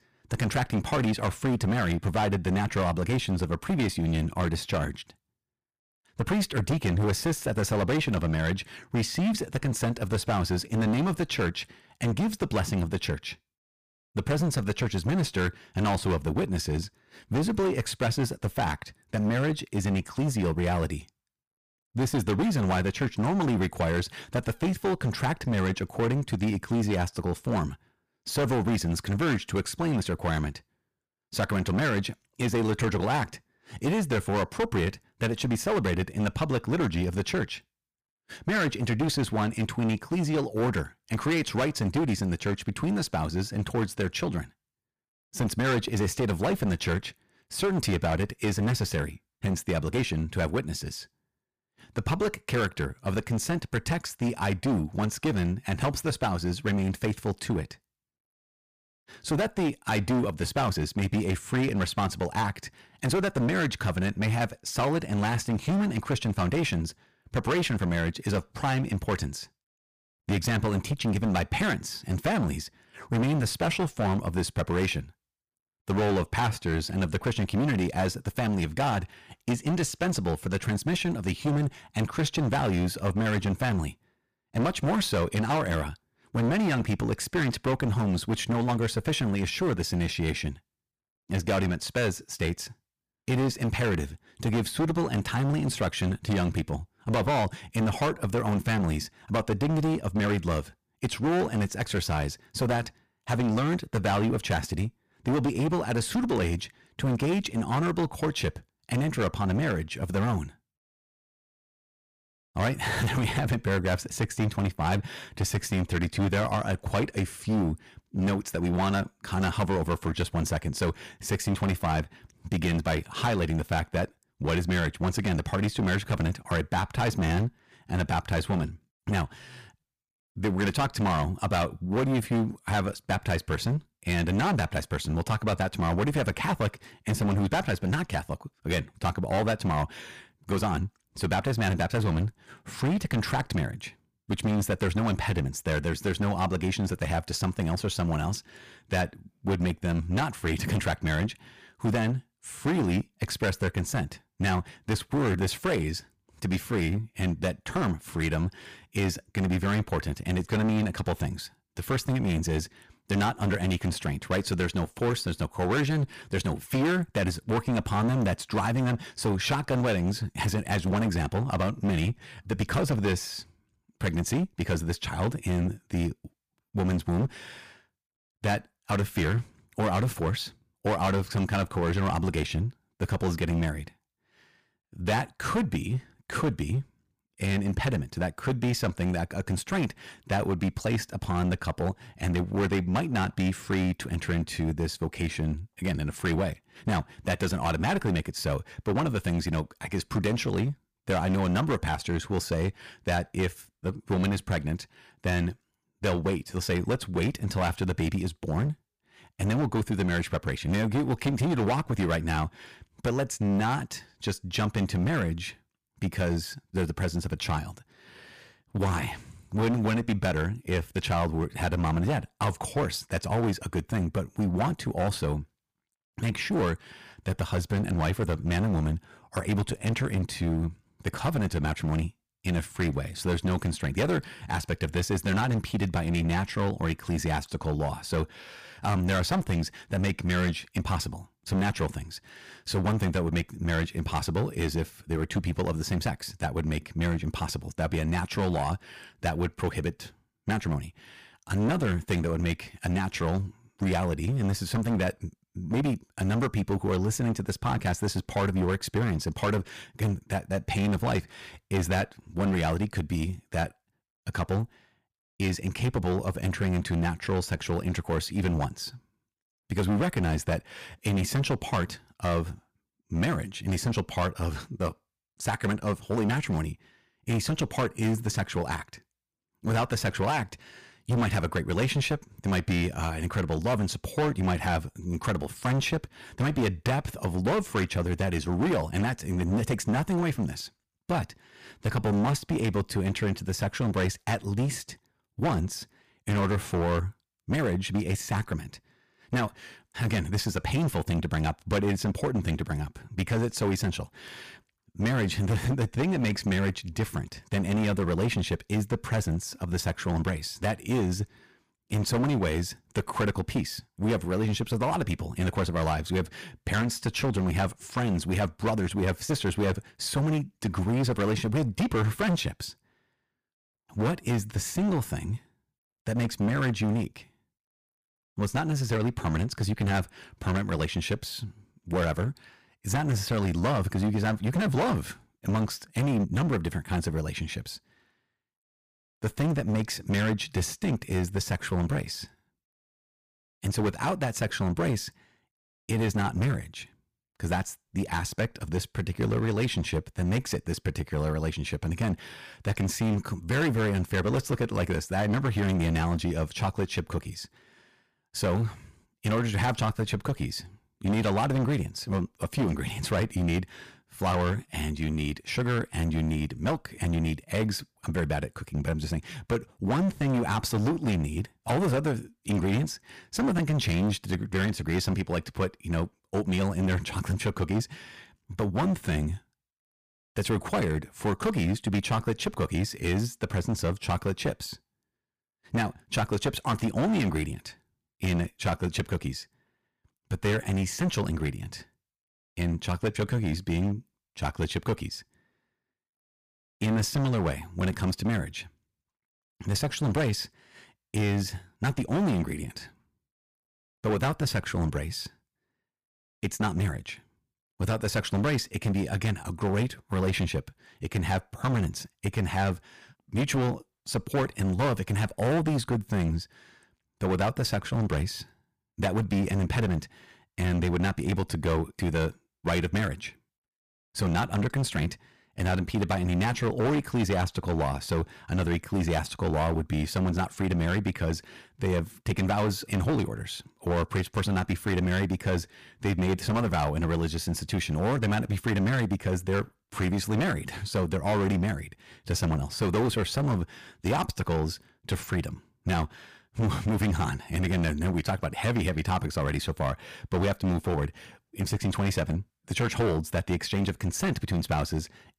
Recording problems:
distortion; heavy; 15% of the sound clipped

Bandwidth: 15 kHz